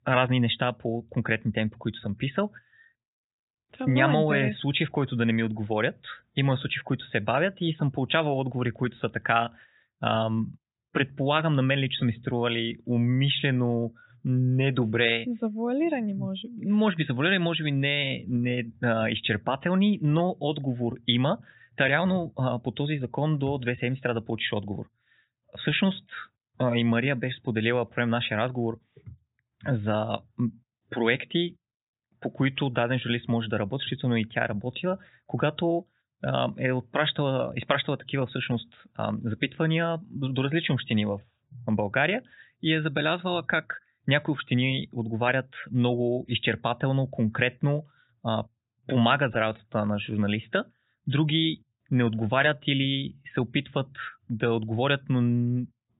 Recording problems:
high frequencies cut off; severe; nothing above 4 kHz

